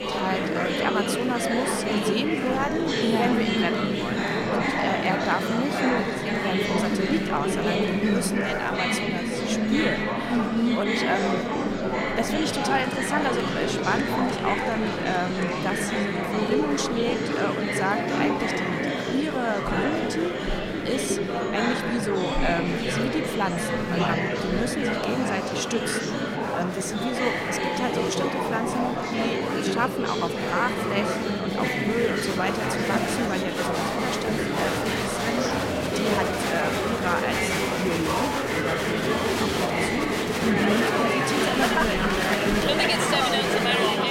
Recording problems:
murmuring crowd; very loud; throughout; 4 dB above the speech

